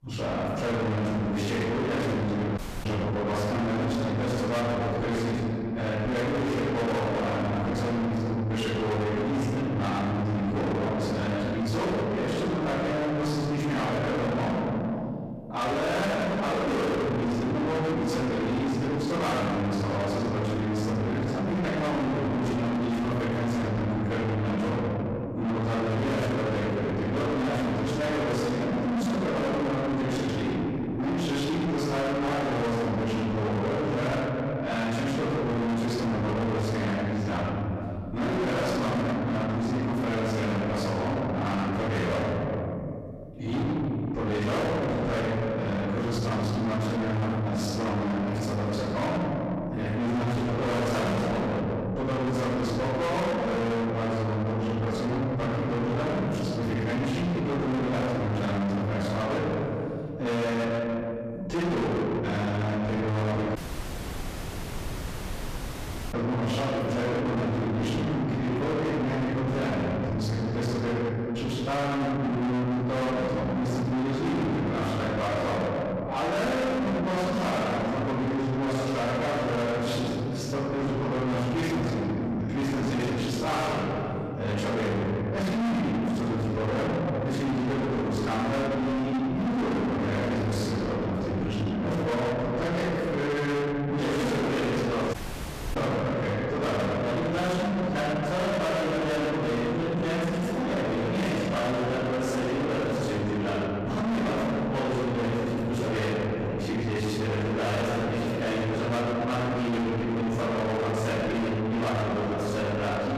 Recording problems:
distortion; heavy; 6 dB below the speech
room echo; strong; dies away in 1.9 s
off-mic speech; far
audio cutting out; at 2.5 s, at 1:04 for 2.5 s and at 1:35 for 0.5 s

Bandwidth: 14.5 kHz